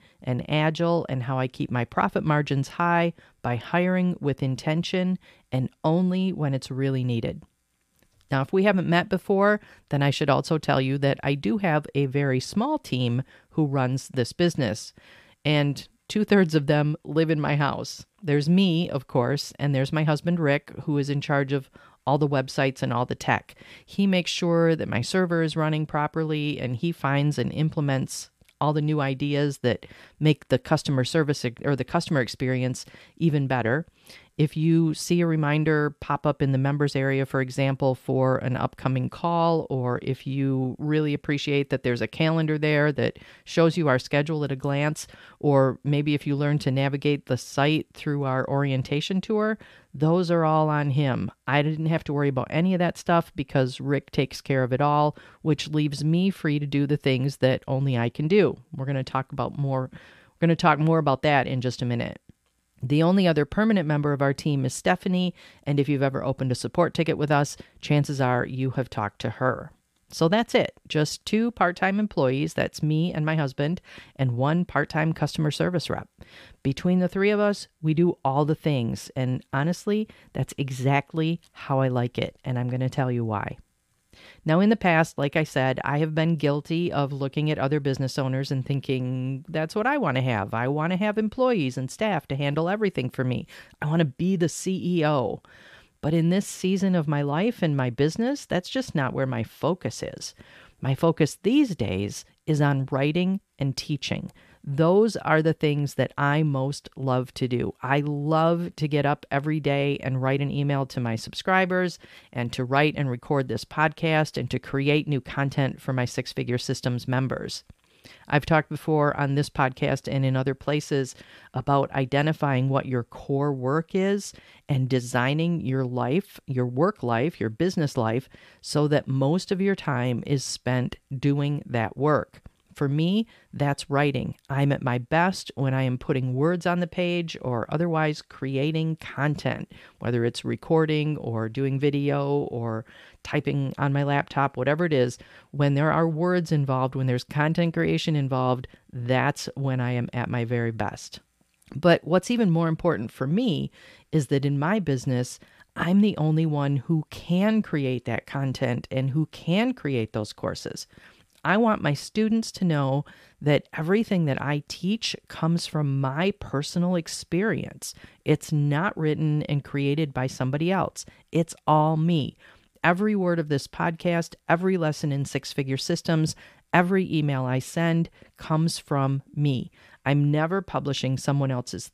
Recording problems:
none

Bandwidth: 15 kHz